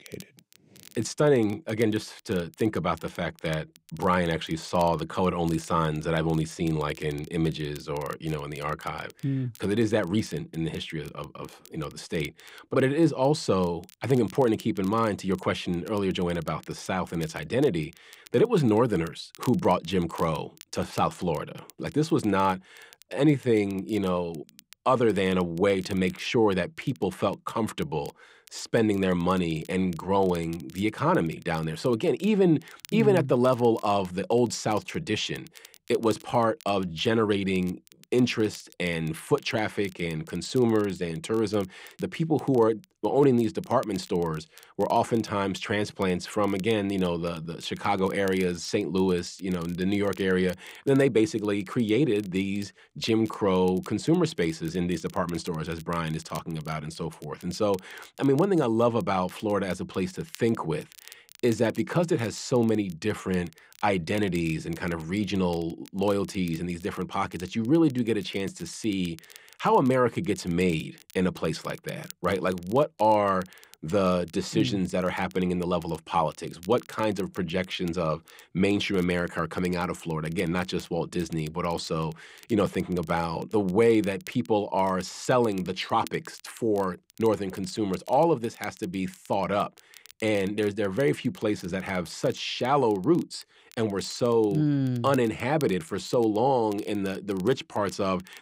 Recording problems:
crackle, like an old record; faint; 25 dB below the speech

